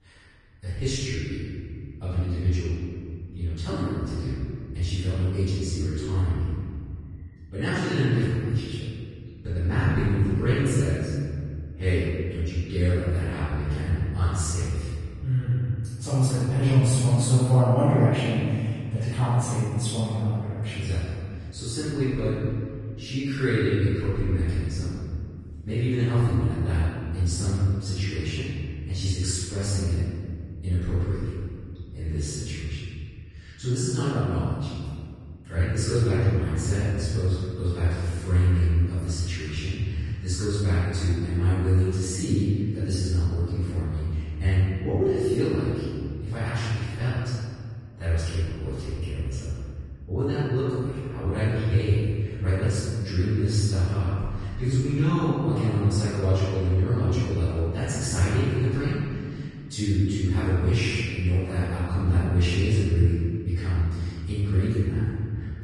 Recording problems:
room echo; strong; dies away in 2.2 s
off-mic speech; far
garbled, watery; slightly; nothing above 10 kHz

